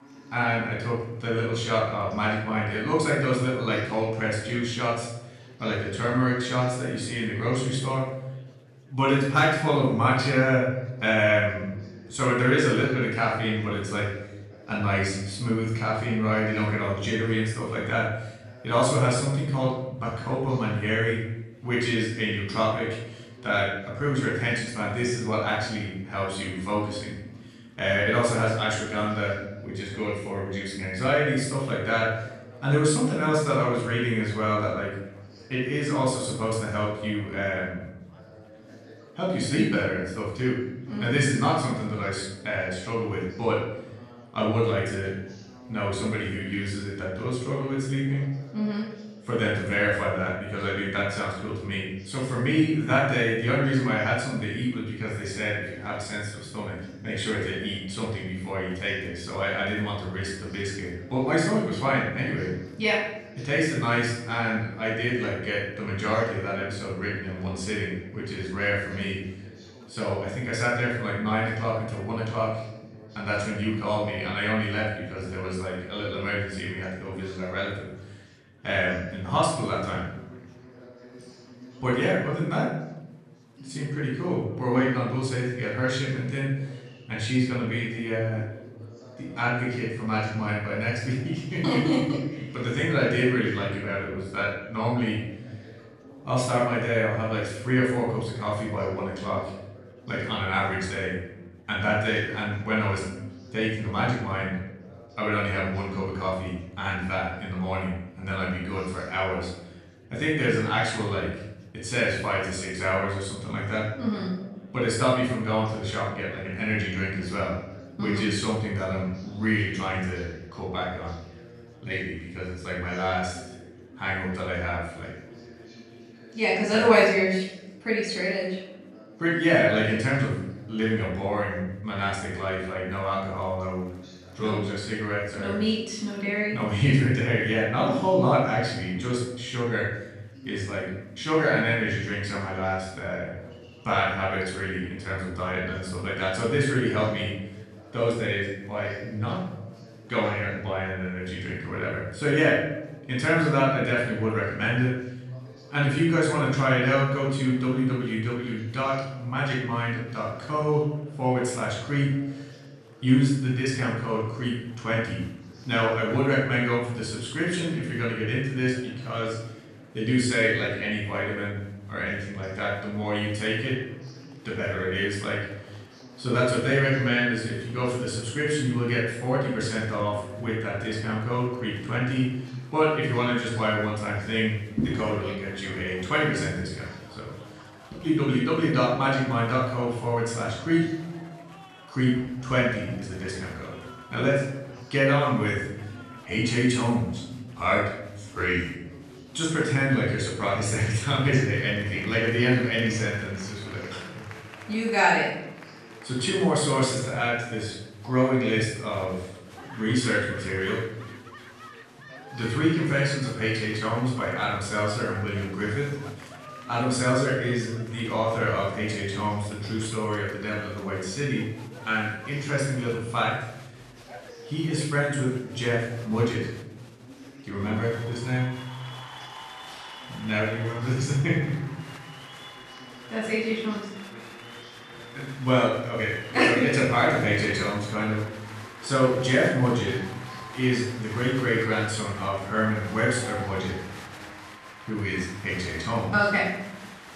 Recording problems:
off-mic speech; far
room echo; noticeable; dies away in 0.8 s
chatter from many people; faint; throughout; 20 dB below the speech

